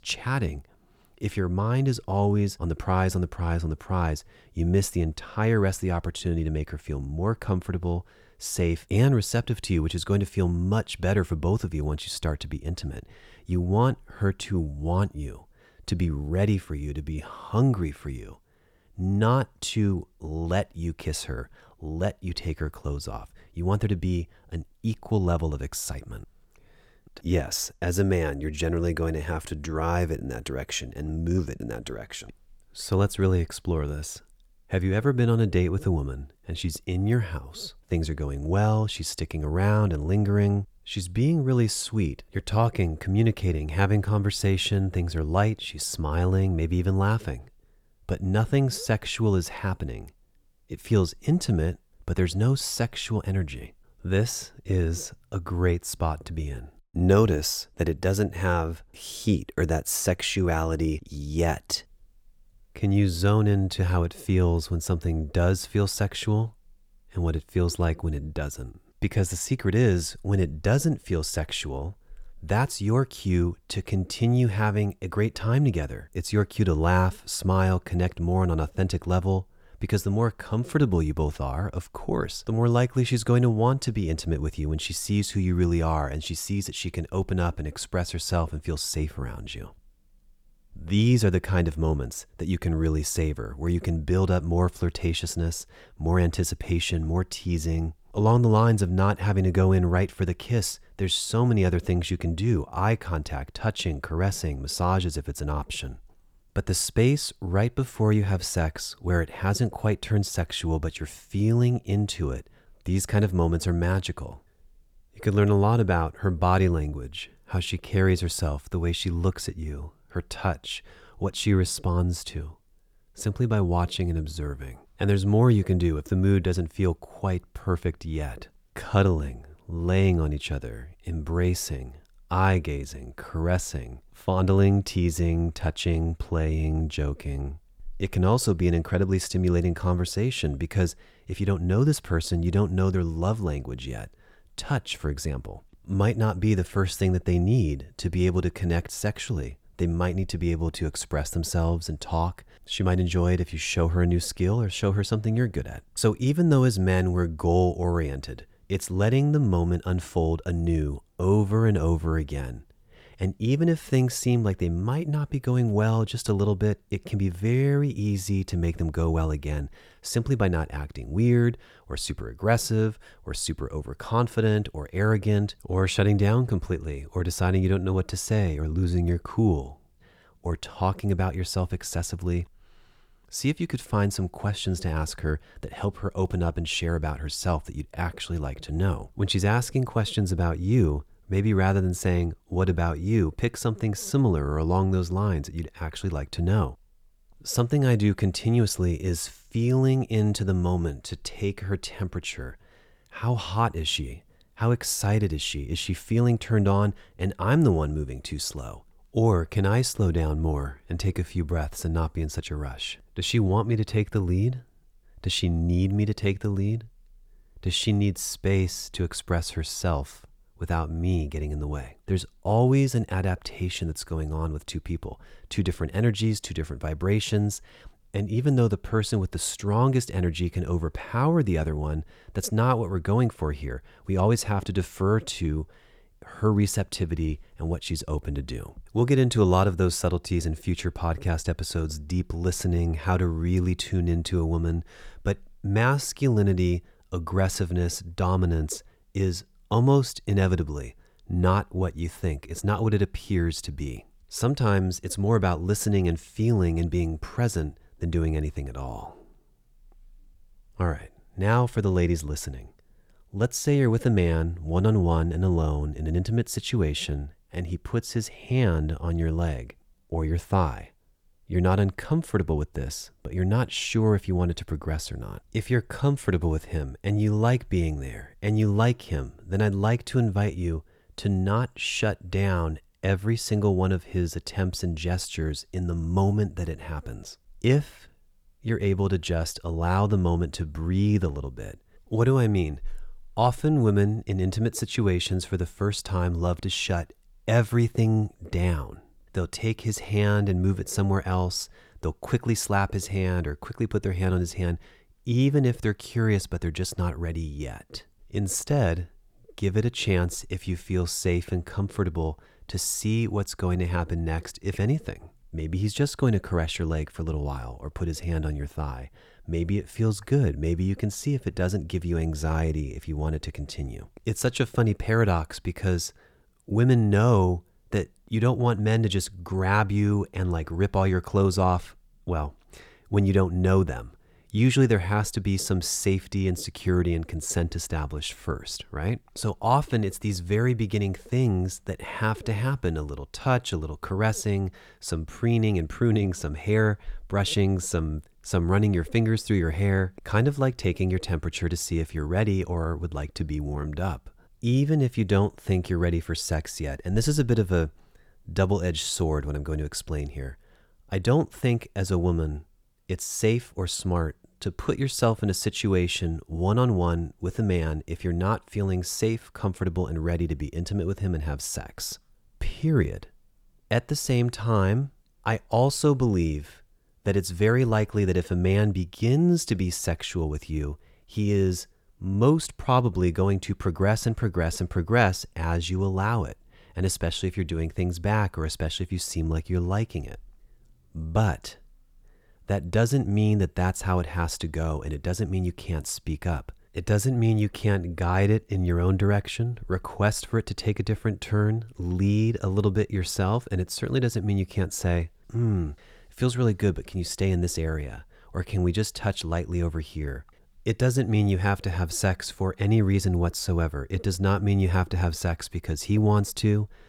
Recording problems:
none

